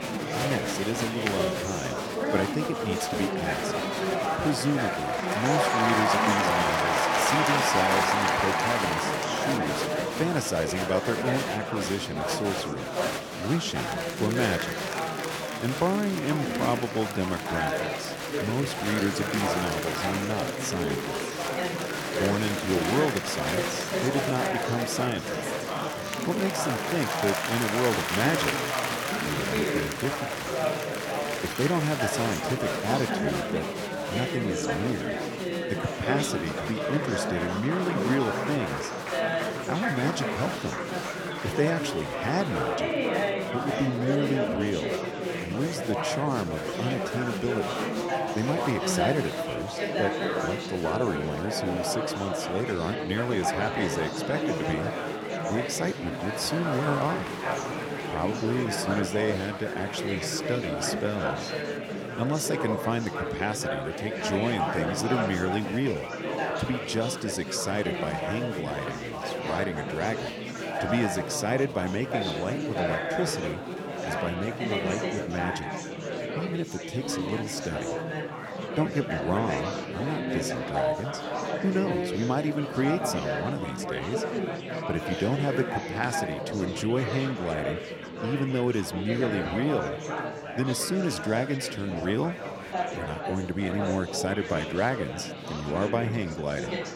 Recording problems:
chatter from many people; very loud; throughout; 1 dB above the speech

